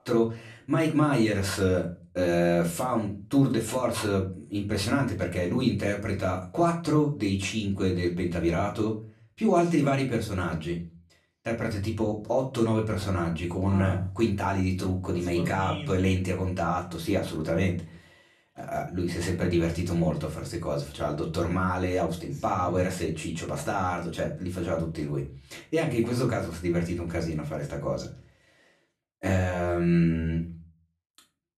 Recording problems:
off-mic speech; far
room echo; very slight; dies away in 0.3 s

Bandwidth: 13.5 kHz